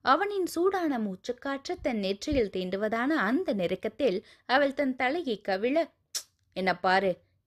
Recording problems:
none

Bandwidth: 14.5 kHz